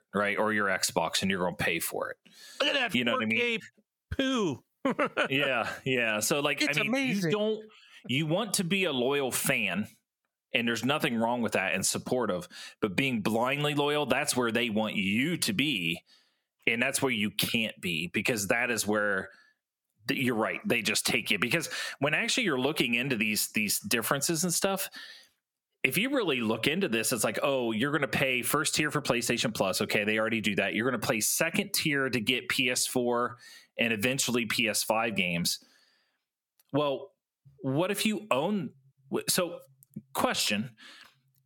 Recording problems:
squashed, flat; heavily

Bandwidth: 18.5 kHz